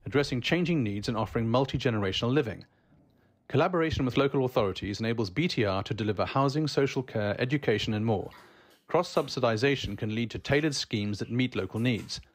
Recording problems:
household noises; faint; throughout; 30 dB below the speech

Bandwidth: 15.5 kHz